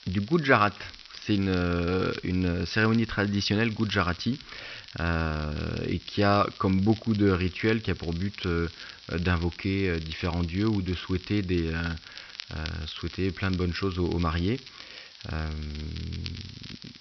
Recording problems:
high frequencies cut off; noticeable; nothing above 5.5 kHz
crackle, like an old record; noticeable; 15 dB below the speech
hiss; faint; throughout; 20 dB below the speech

